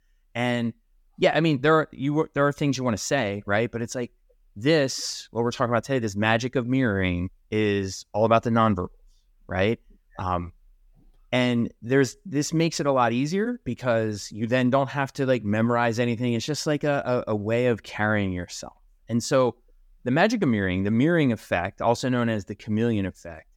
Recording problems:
none

